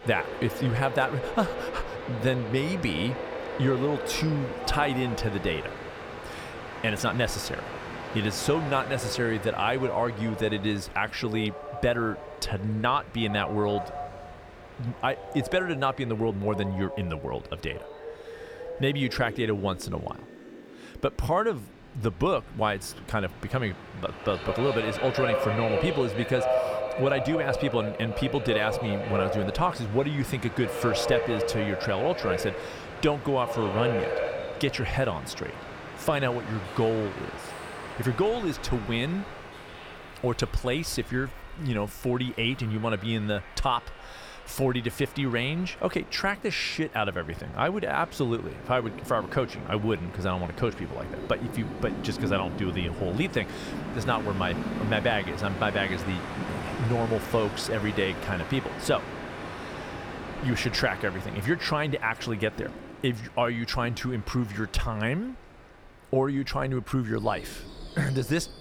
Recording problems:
train or aircraft noise; loud; throughout; 7 dB below the speech

